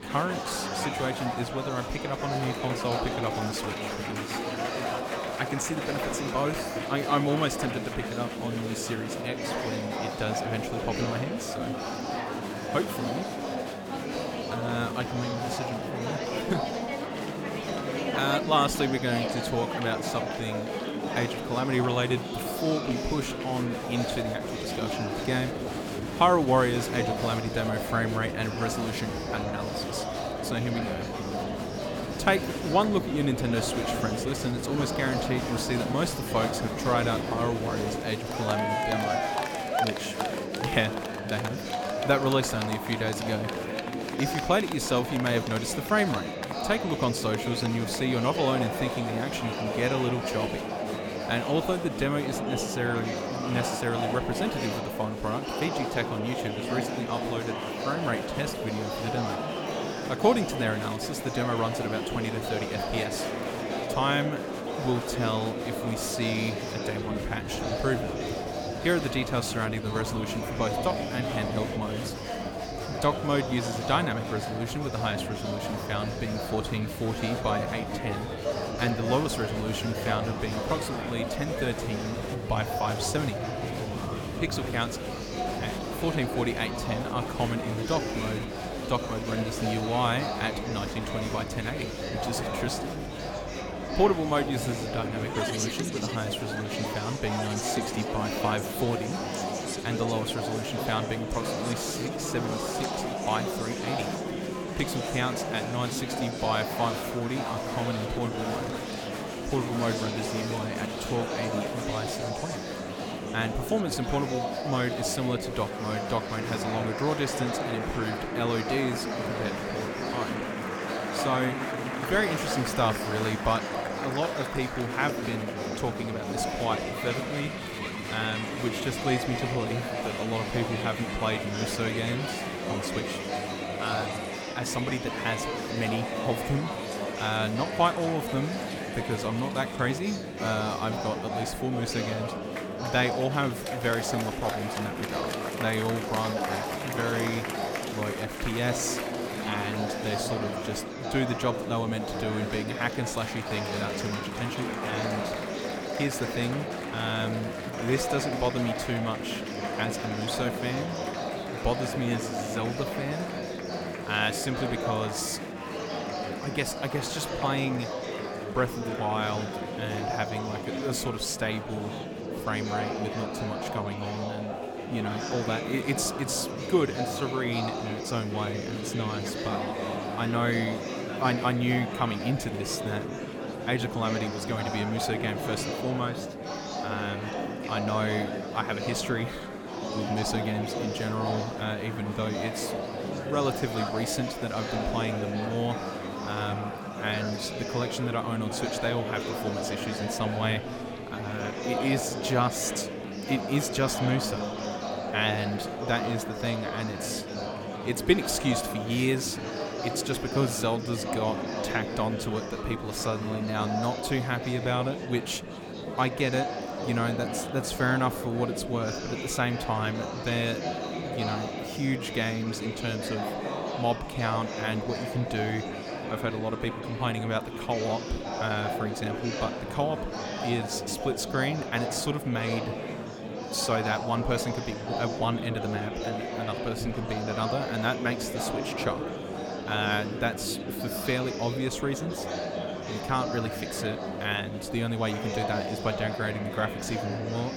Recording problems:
murmuring crowd; loud; throughout; 2 dB below the speech

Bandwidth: 18.5 kHz